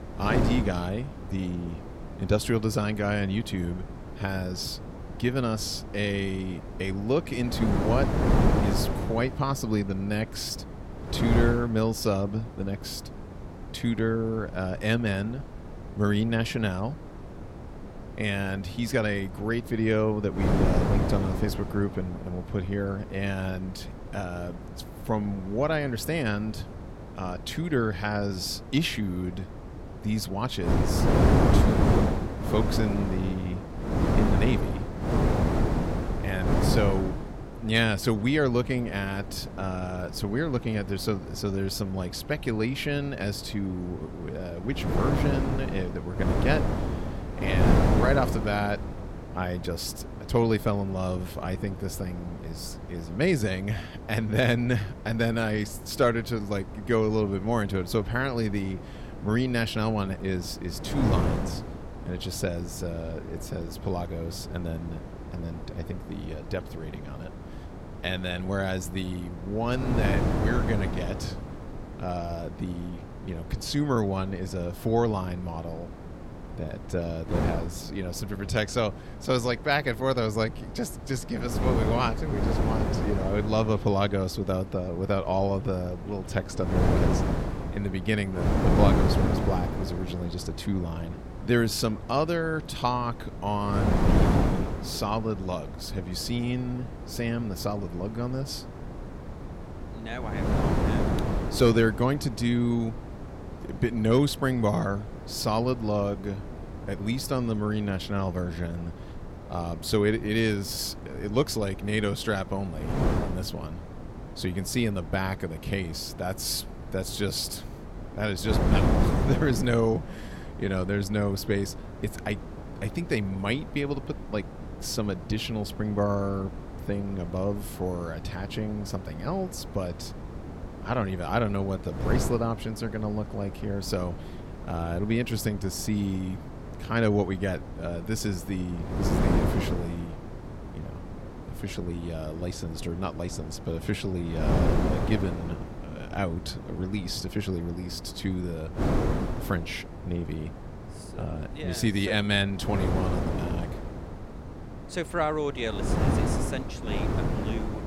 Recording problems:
wind noise on the microphone; heavy; 6 dB below the speech

